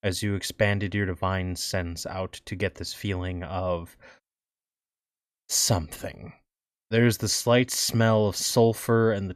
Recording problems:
none

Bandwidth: 14.5 kHz